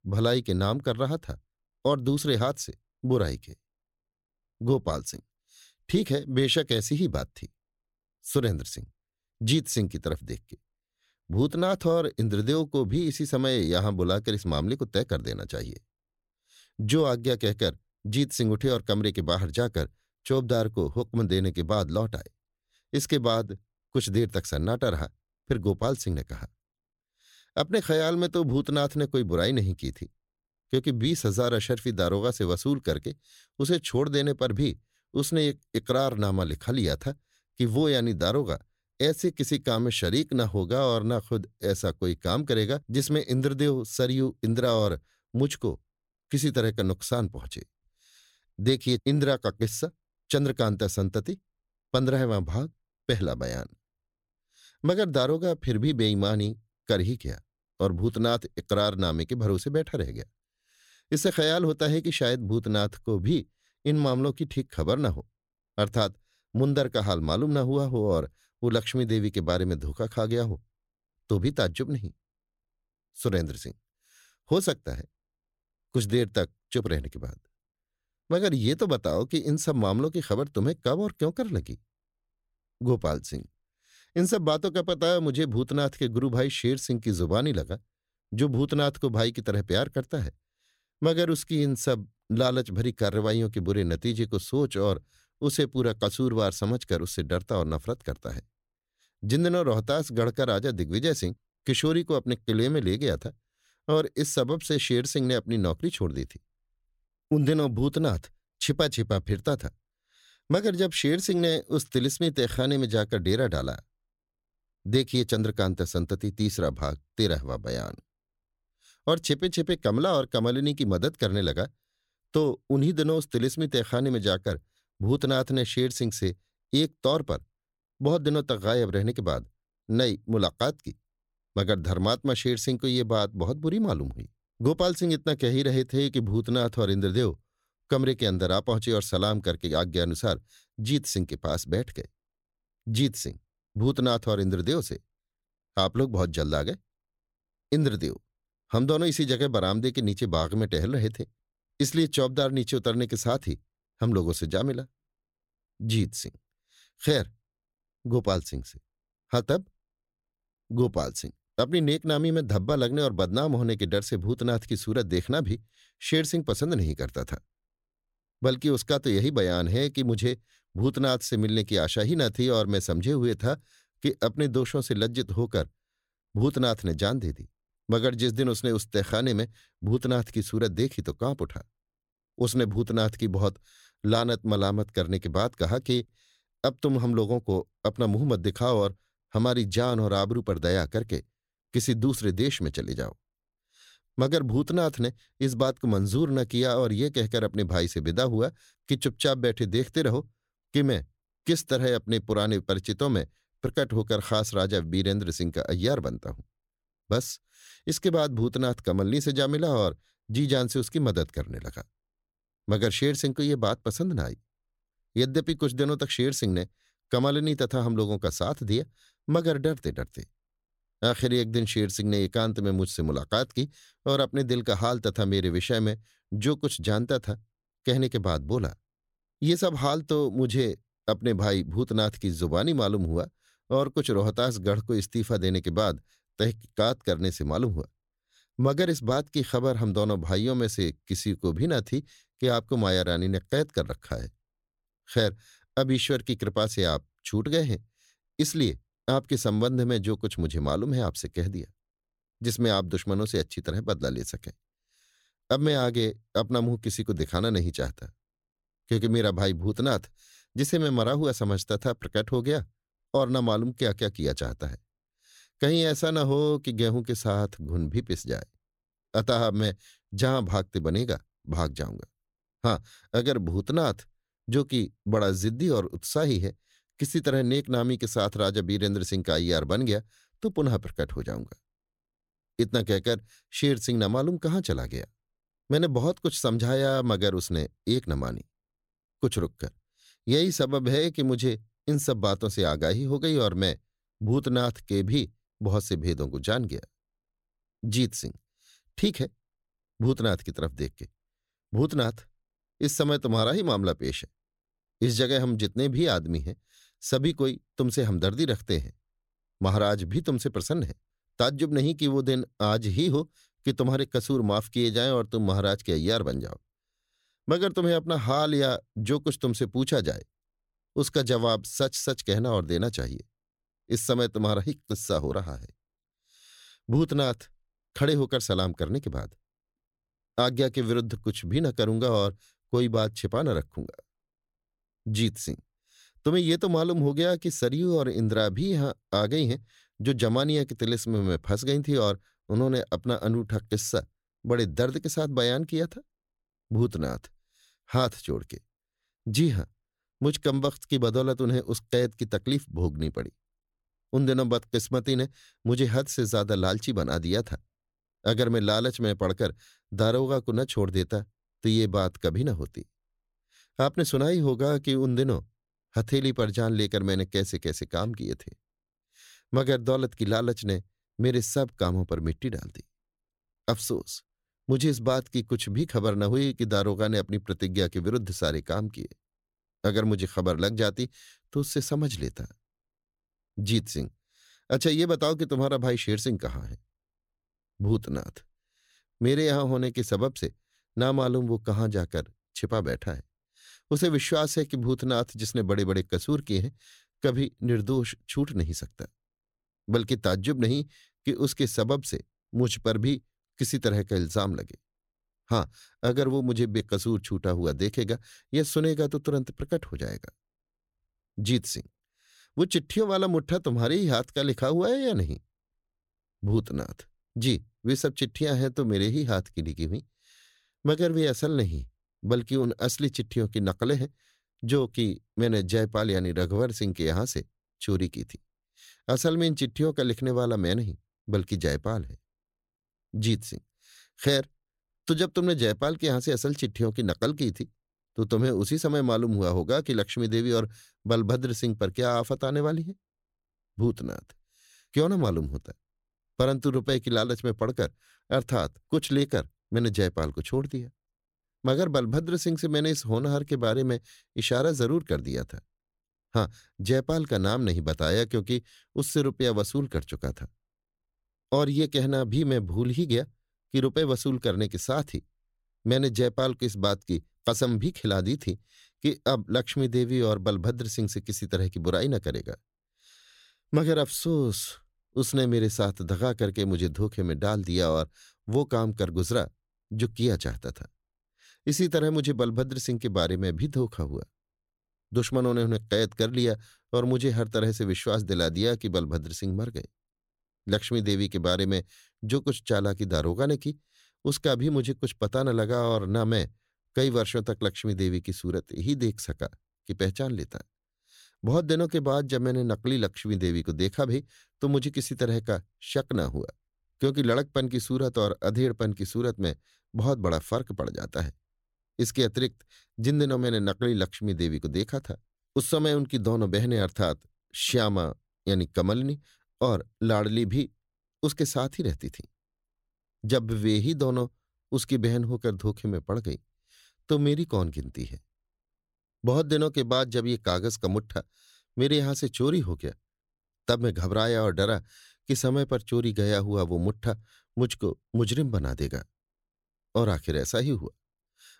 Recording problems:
none

